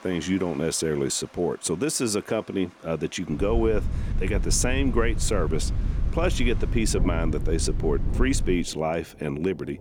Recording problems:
rain or running water; noticeable; throughout; 20 dB below the speech
wind noise on the microphone; occasional gusts; from 3.5 to 8.5 s; 15 dB below the speech

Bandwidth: 18 kHz